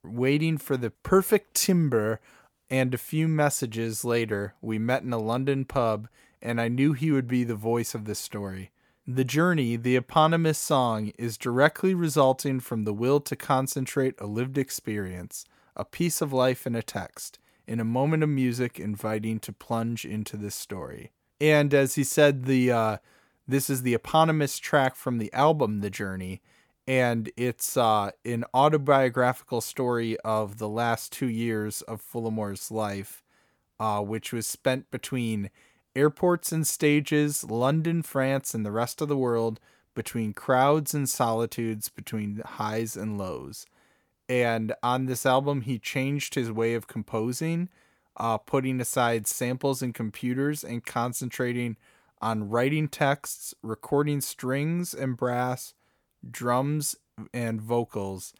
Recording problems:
none

